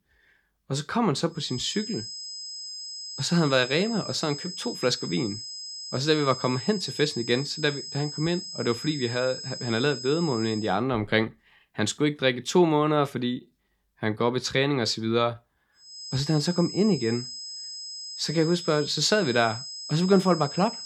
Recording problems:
high-pitched whine; loud; from 1.5 to 11 s and from 16 s on; 5 kHz, 9 dB below the speech

